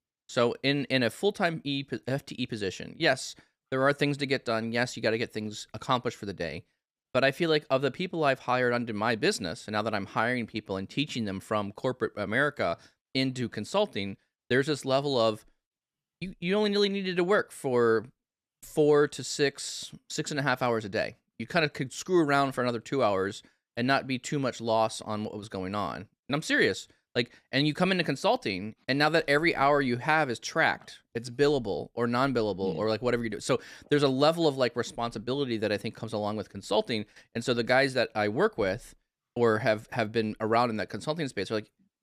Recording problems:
none

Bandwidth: 15 kHz